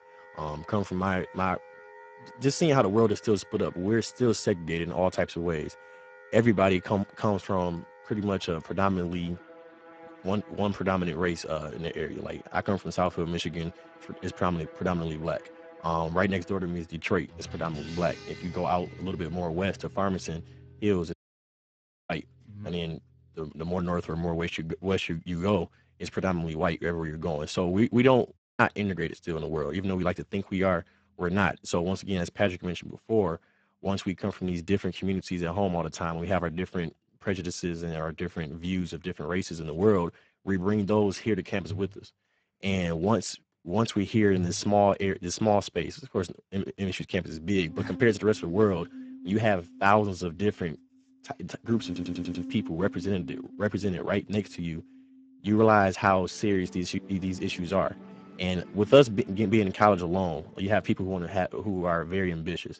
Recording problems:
garbled, watery; badly; nothing above 8 kHz
background music; noticeable; throughout; 20 dB below the speech
audio cutting out; at 21 s for 1 s and at 28 s
audio stuttering; at 52 s

